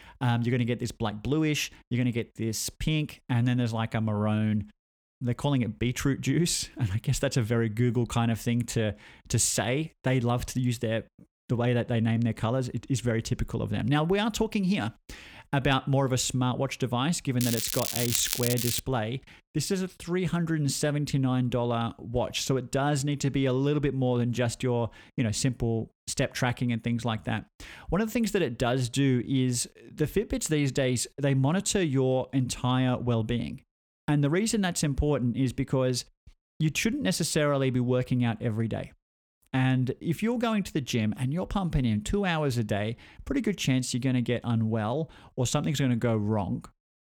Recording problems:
crackling; loud; from 17 to 19 s; 2 dB below the speech

